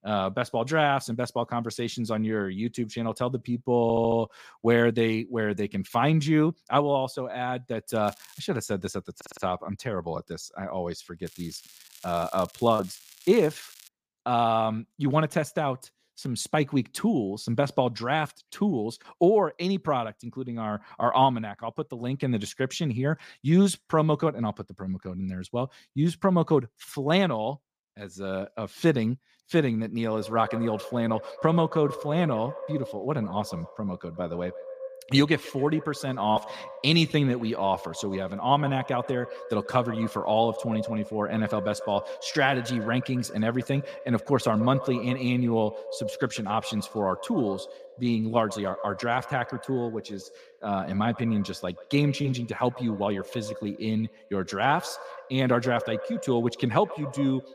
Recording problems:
echo of what is said; noticeable; from 30 s on; 140 ms later, 15 dB below the speech
crackling; faint; at 8 s and from 11 to 14 s; 20 dB below the speech
audio stuttering; at 4 s and at 9 s

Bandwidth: 15 kHz